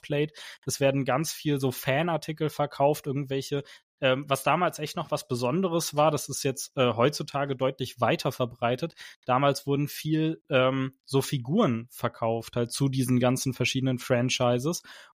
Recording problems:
none

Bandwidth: 15 kHz